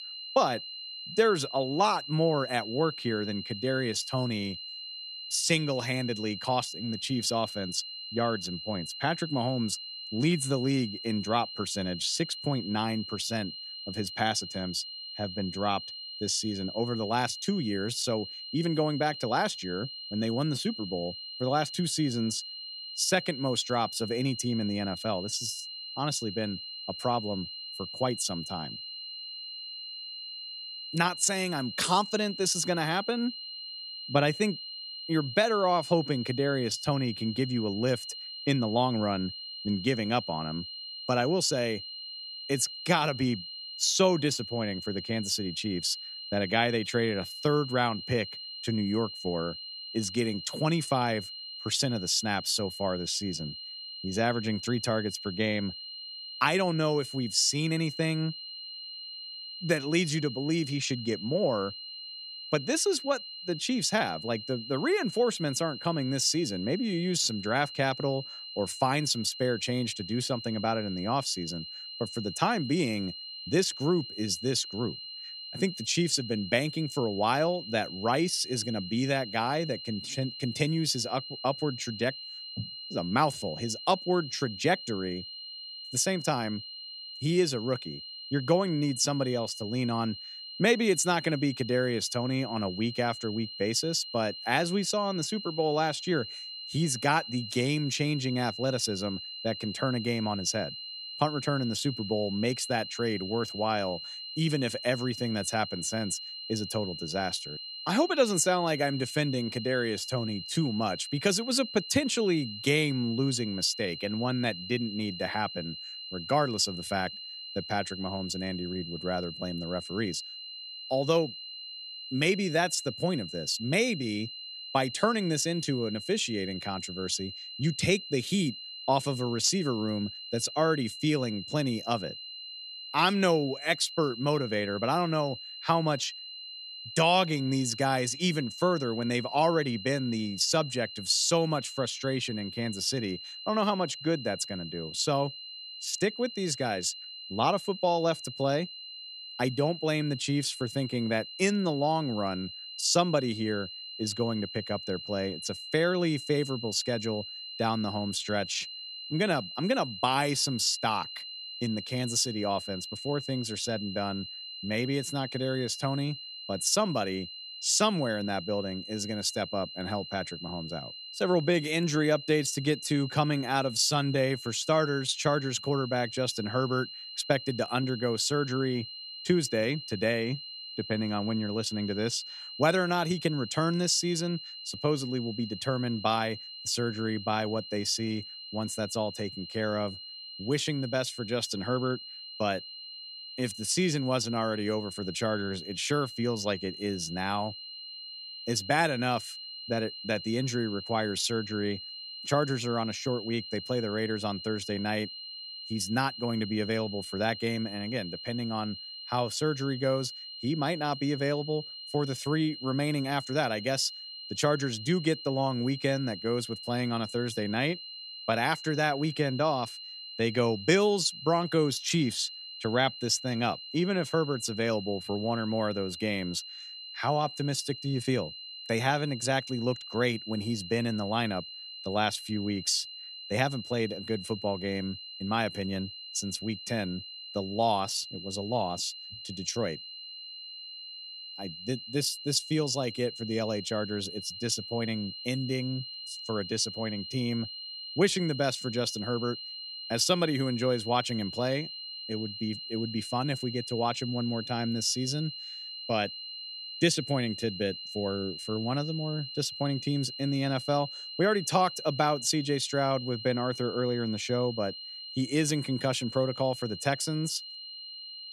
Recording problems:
high-pitched whine; loud; throughout; 4 kHz, 9 dB below the speech

